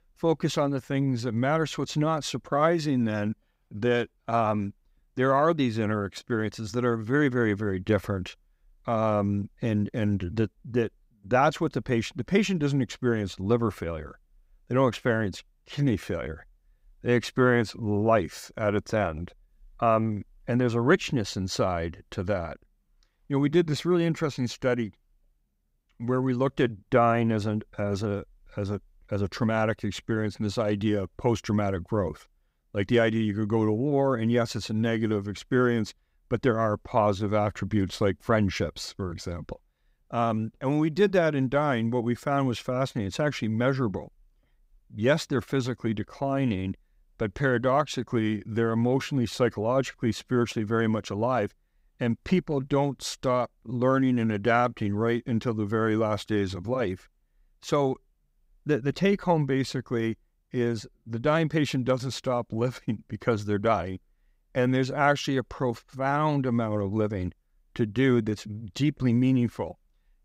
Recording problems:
none

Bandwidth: 15.5 kHz